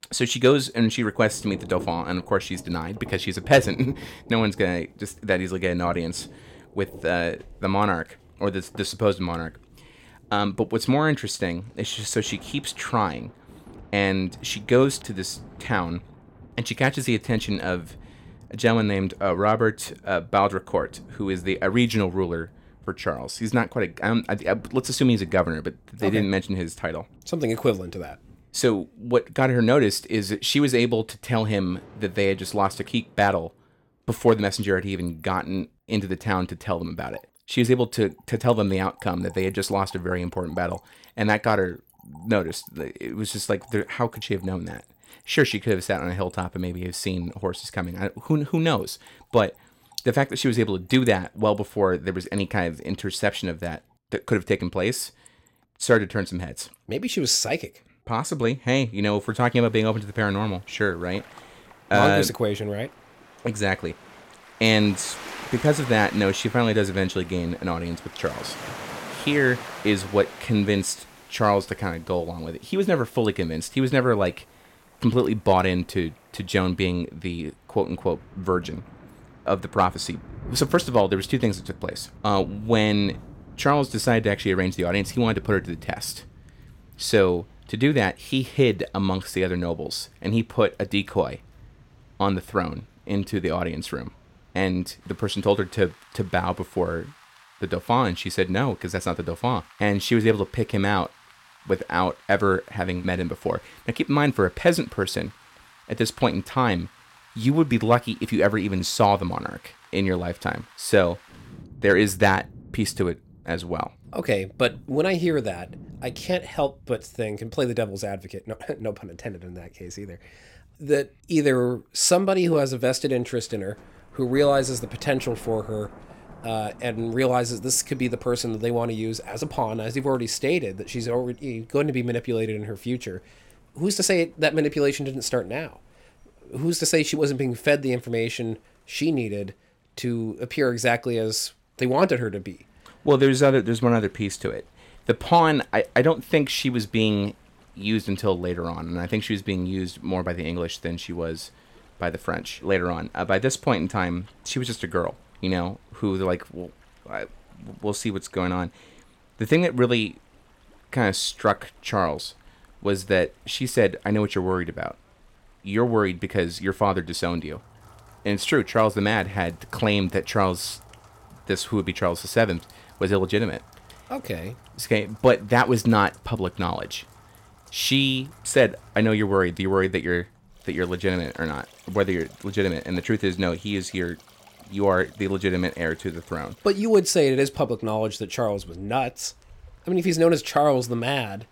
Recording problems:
rain or running water; faint; throughout; 25 dB below the speech

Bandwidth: 16.5 kHz